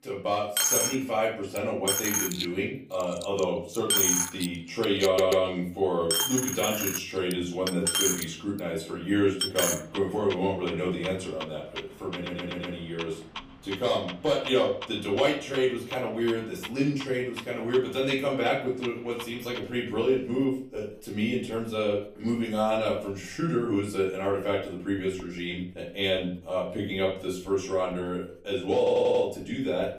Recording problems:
off-mic speech; far
room echo; slight; dies away in 0.4 s
household noises; loud; throughout; 2 dB below the speech
audio stuttering; at 5 s, at 12 s and at 29 s

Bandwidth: 15 kHz